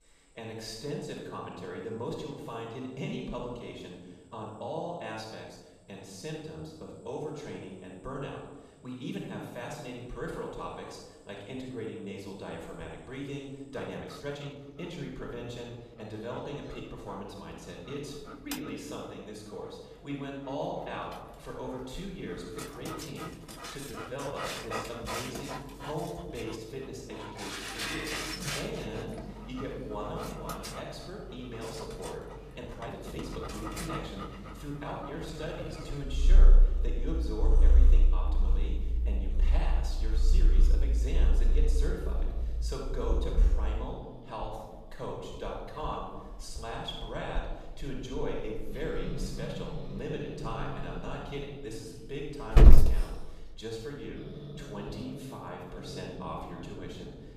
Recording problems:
off-mic speech; far
room echo; noticeable; dies away in 1 s
animal sounds; very loud; throughout; 8 dB above the speech
uneven, jittery; strongly; from 4.5 to 36 s

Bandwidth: 14.5 kHz